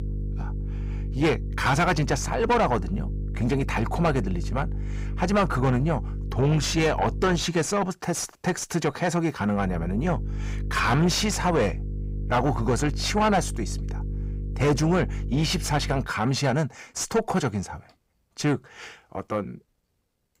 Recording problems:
distortion; heavy; 7 dB below the speech
electrical hum; noticeable; until 7.5 s and from 9.5 to 16 s; 50 Hz, 20 dB below the speech

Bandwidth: 15.5 kHz